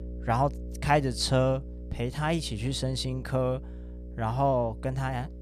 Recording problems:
electrical hum; faint; throughout; 60 Hz, 20 dB below the speech

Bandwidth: 14.5 kHz